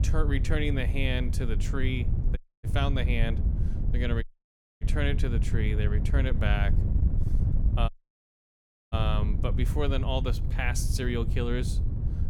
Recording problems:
wind noise on the microphone; heavy; 9 dB below the speech
audio cutting out; at 2.5 s, at 4 s for 0.5 s and at 8 s for 1 s

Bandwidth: 18 kHz